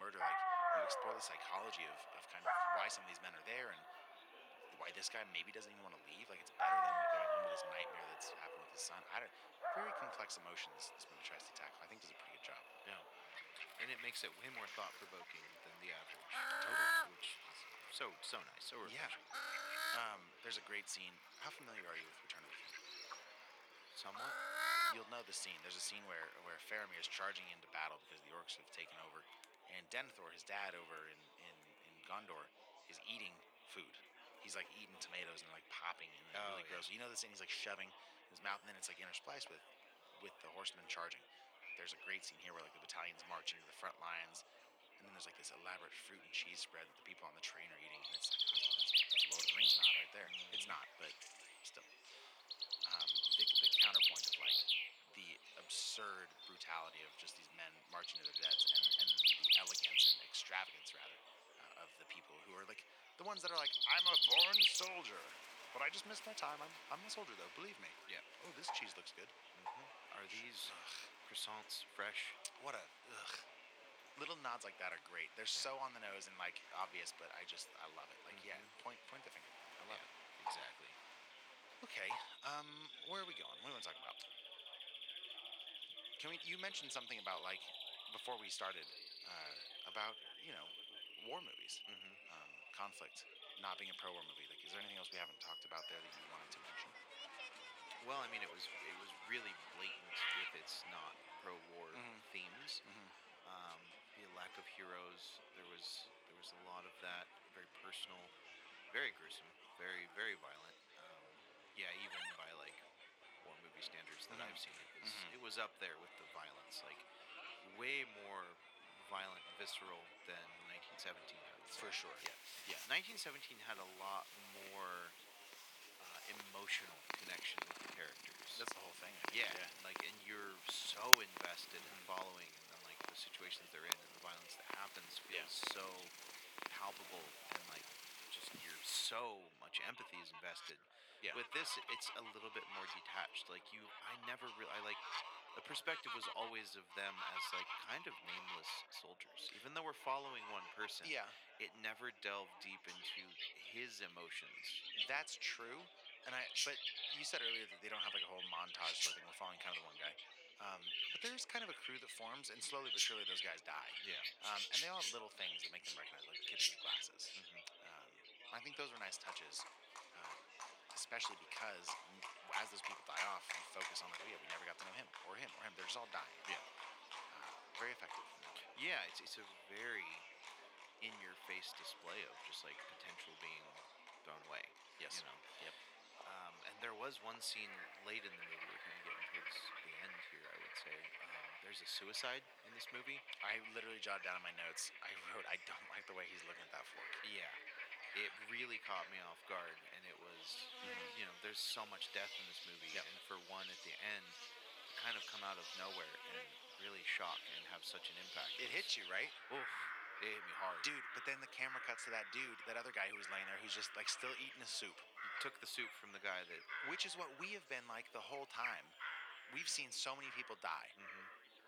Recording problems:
thin; very; fading below 650 Hz
animal sounds; very loud; throughout; 7 dB above the speech
chatter from many people; noticeable; throughout; 15 dB below the speech
abrupt cut into speech; at the start

